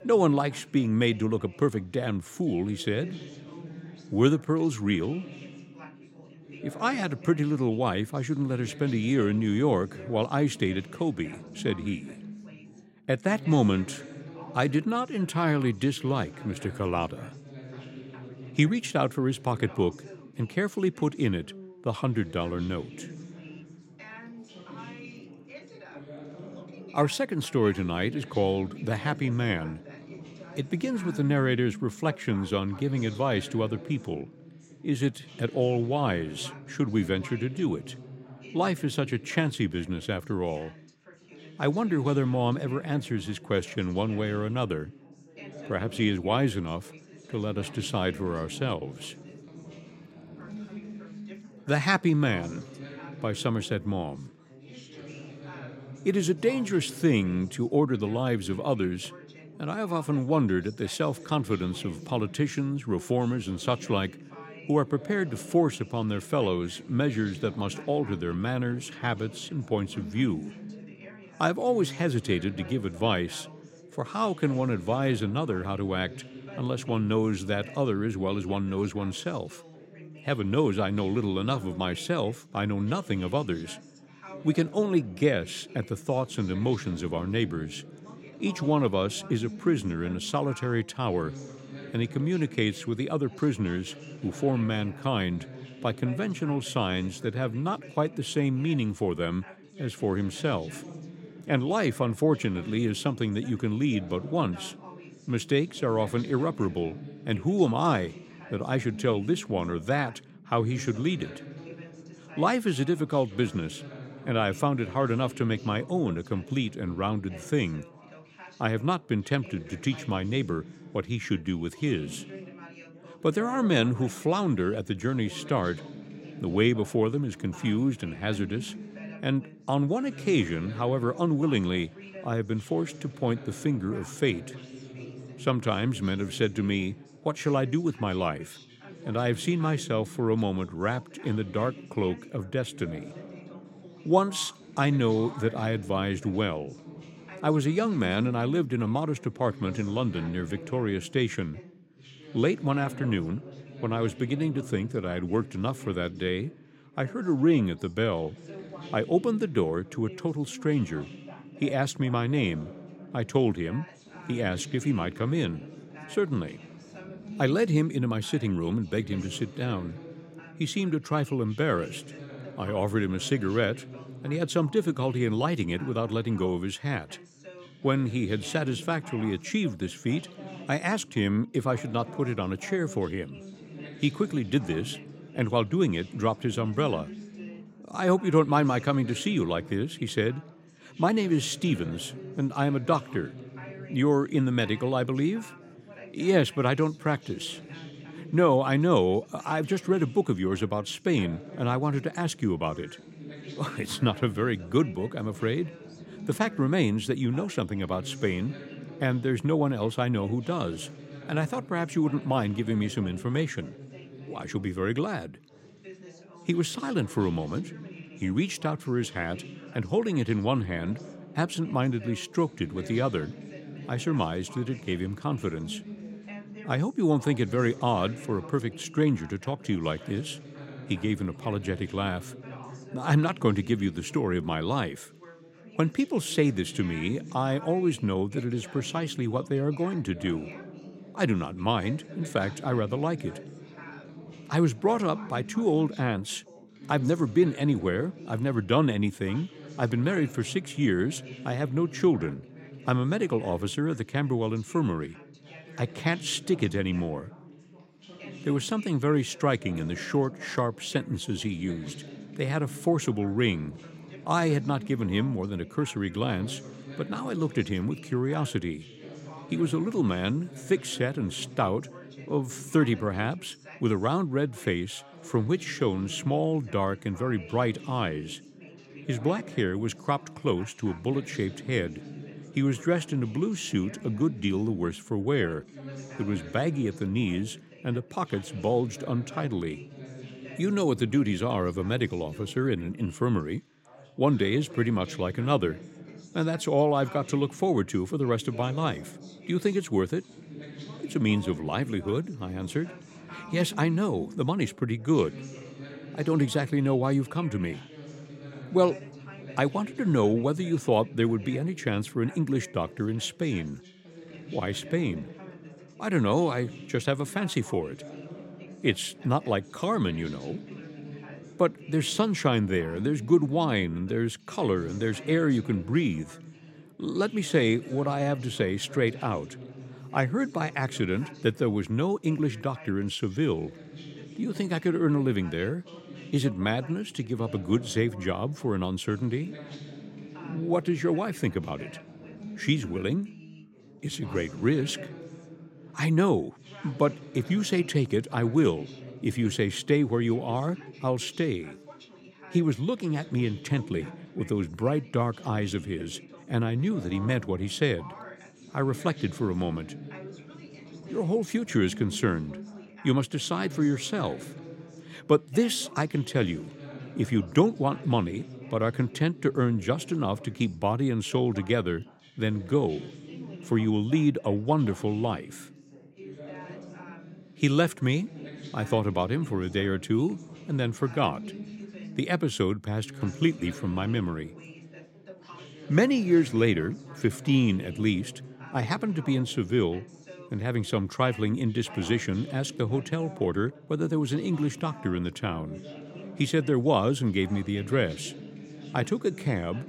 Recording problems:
background chatter; noticeable; throughout; 3 voices, 15 dB below the speech

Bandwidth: 16 kHz